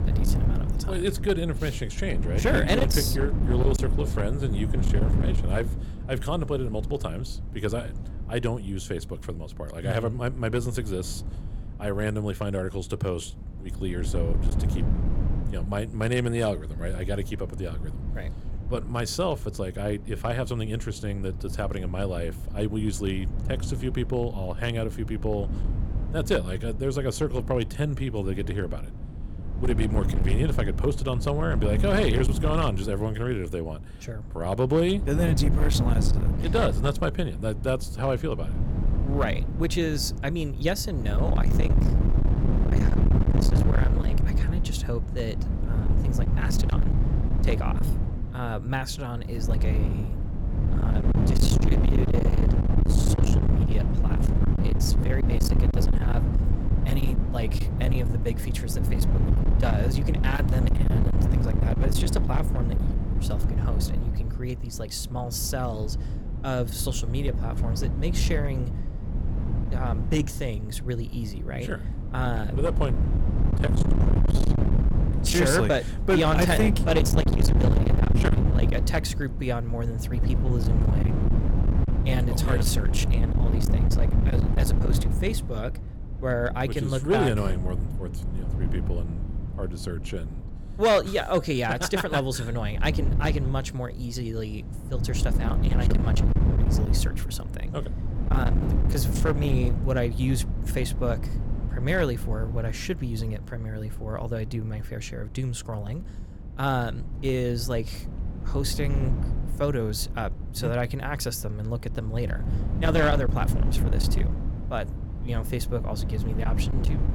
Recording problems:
distortion; heavy; 10% of the sound clipped
wind noise on the microphone; heavy; 7 dB below the speech

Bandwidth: 17.5 kHz